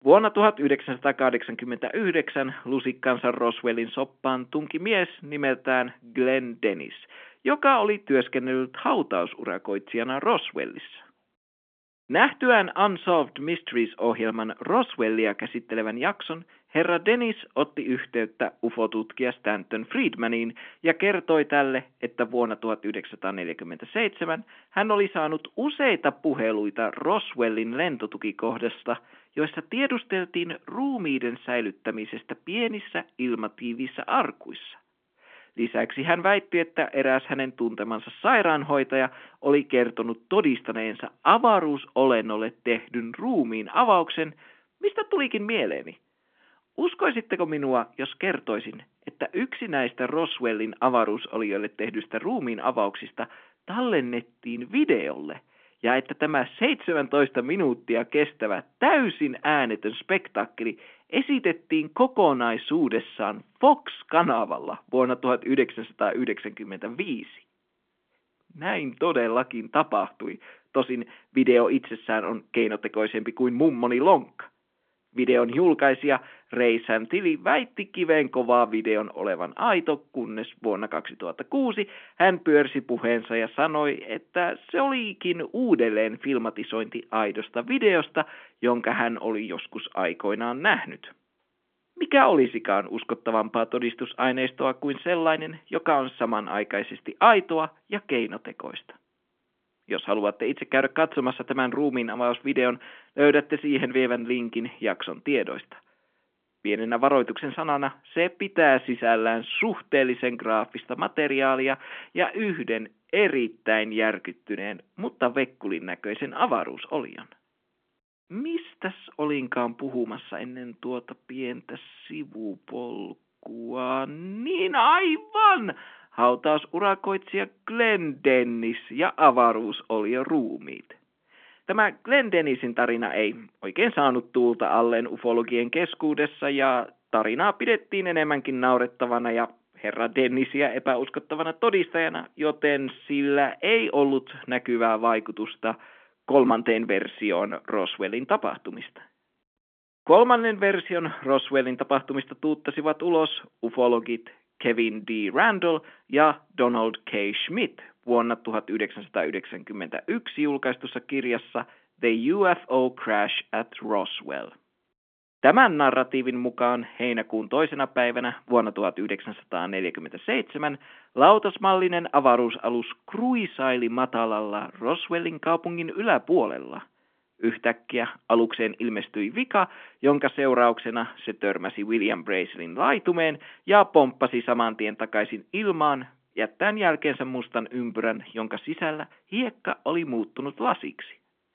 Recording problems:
phone-call audio; nothing above 3.5 kHz

